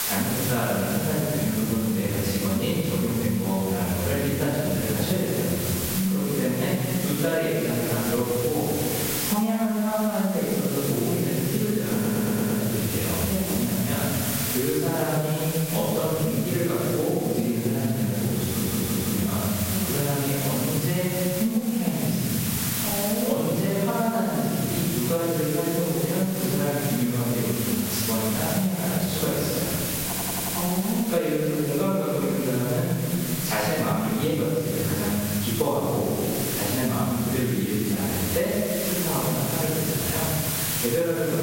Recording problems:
room echo; strong; dies away in 1.8 s
off-mic speech; far
squashed, flat; somewhat
hiss; very faint; throughout; 4 dB below the speech
audio stuttering; at 12 s, at 18 s and at 30 s

